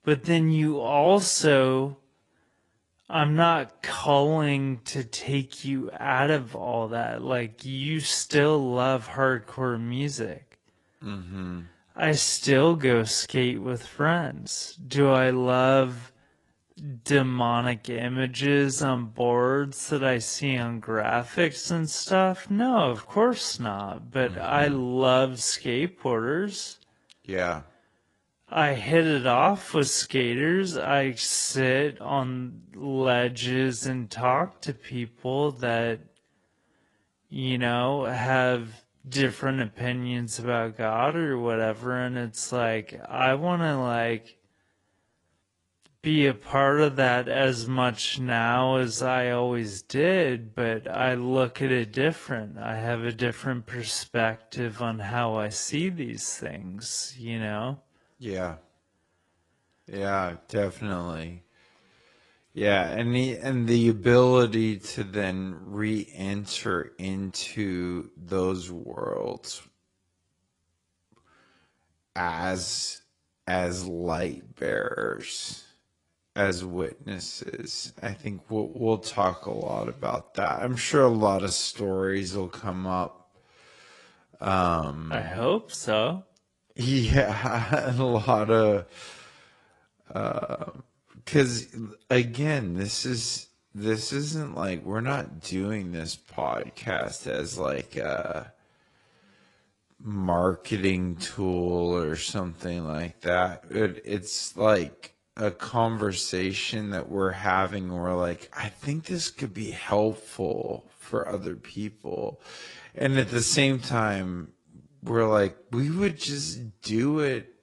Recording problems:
wrong speed, natural pitch; too slow; 0.5 times normal speed
garbled, watery; slightly; nothing above 10.5 kHz

